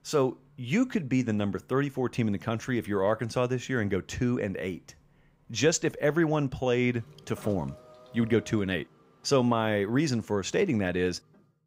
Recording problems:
traffic noise; faint; throughout; 25 dB below the speech

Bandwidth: 15.5 kHz